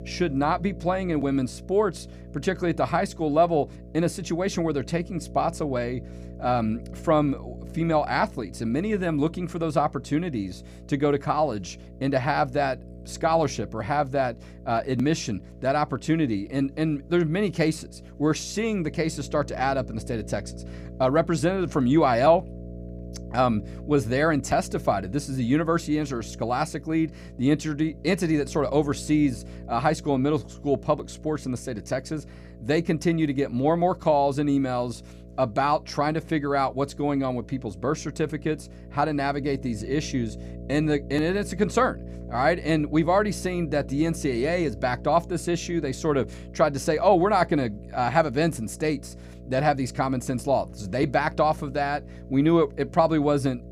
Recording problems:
electrical hum; faint; throughout; 60 Hz, 25 dB below the speech

